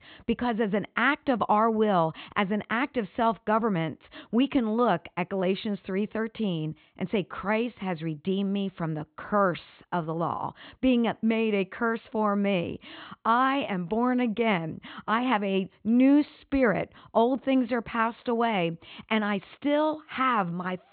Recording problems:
high frequencies cut off; severe; nothing above 4 kHz

